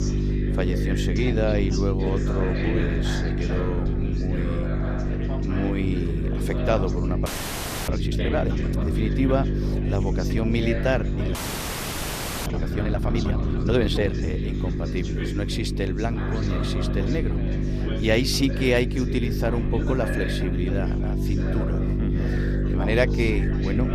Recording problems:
electrical hum; loud; throughout; 50 Hz, 6 dB below the speech
background chatter; loud; throughout; 4 voices, 8 dB below the speech
low rumble; faint; throughout; 25 dB below the speech
audio freezing; at 7.5 s for 0.5 s and at 11 s for 1 s

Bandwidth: 14.5 kHz